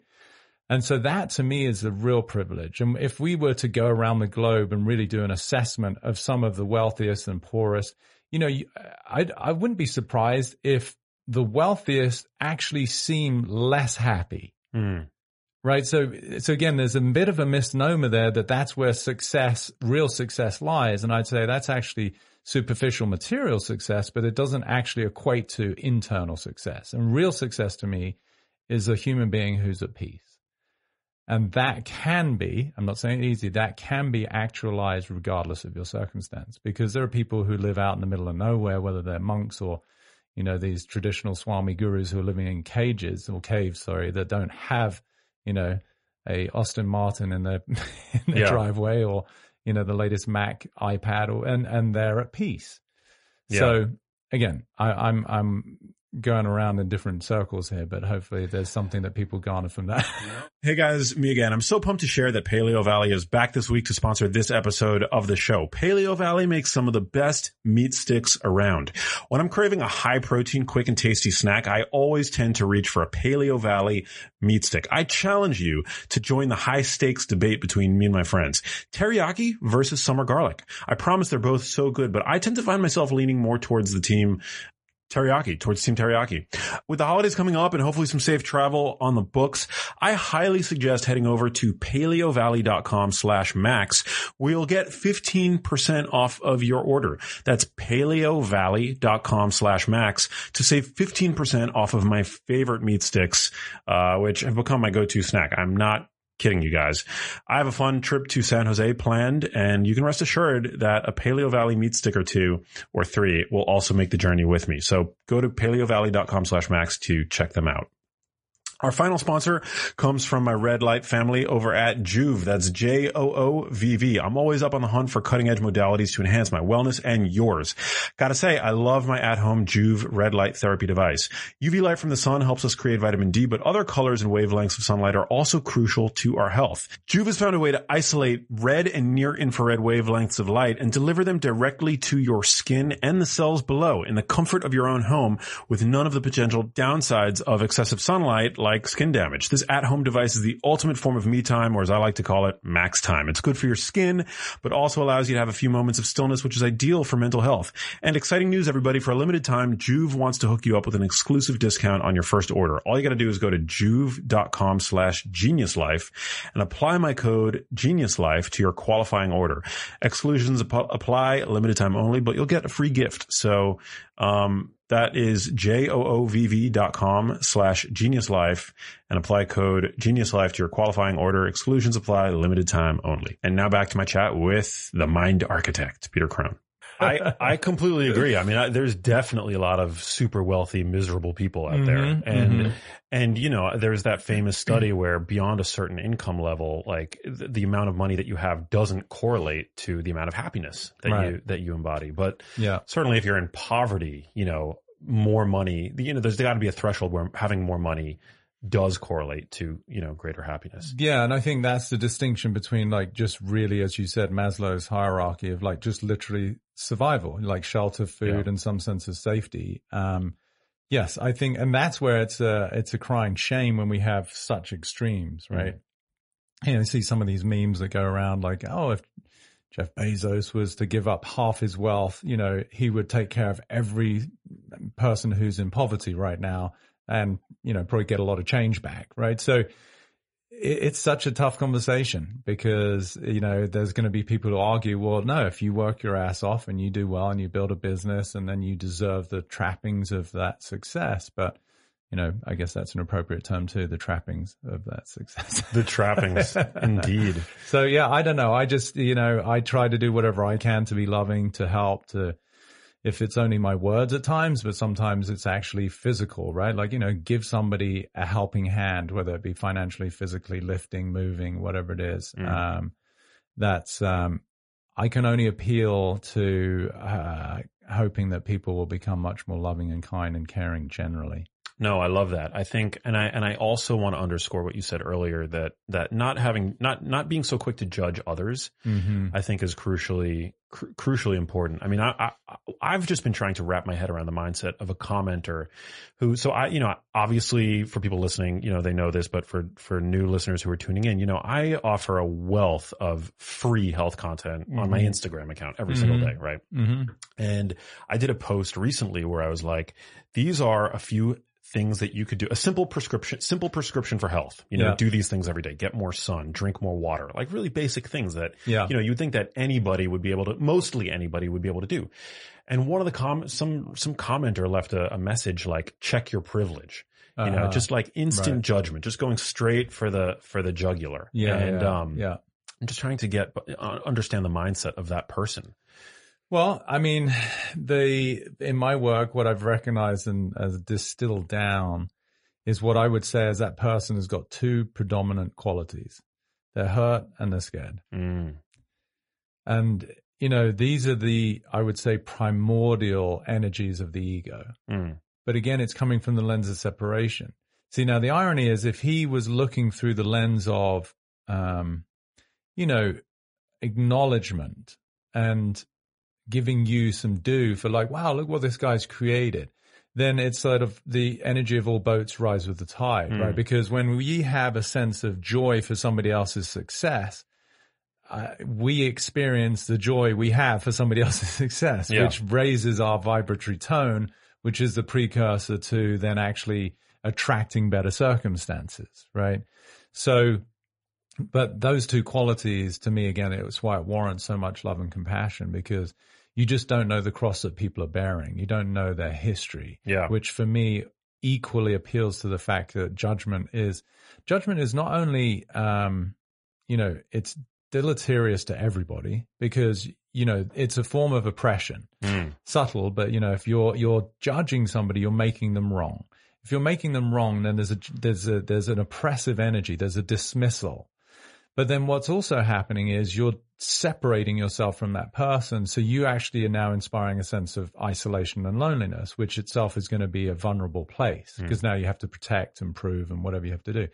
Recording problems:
garbled, watery; slightly; nothing above 10.5 kHz

